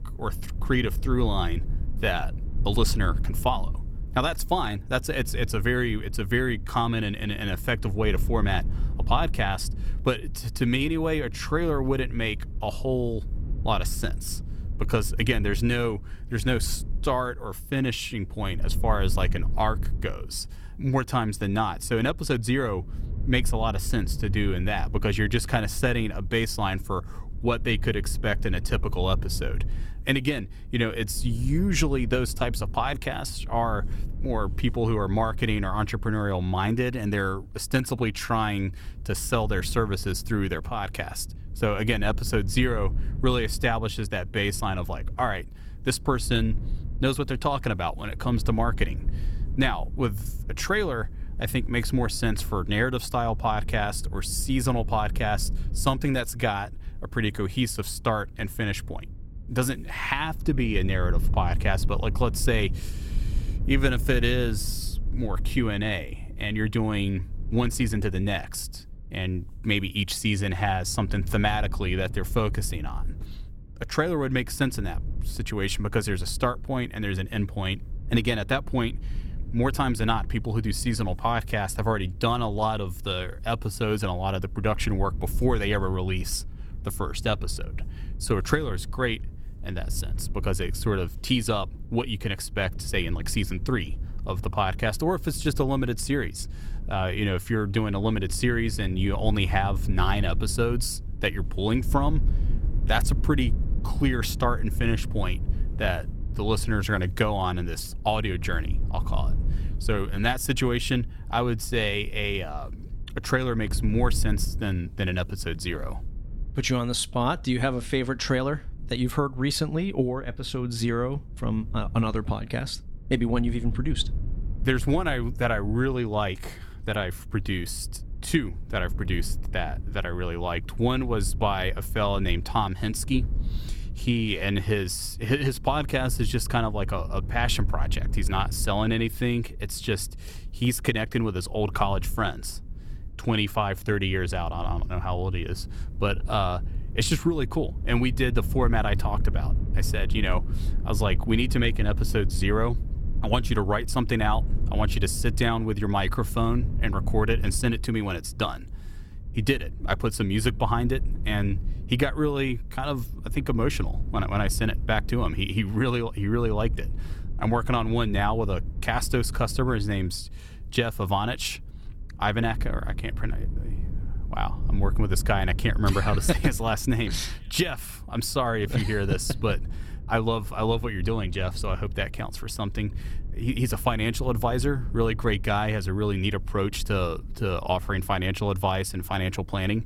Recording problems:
low rumble; faint; throughout; 20 dB below the speech

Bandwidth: 16.5 kHz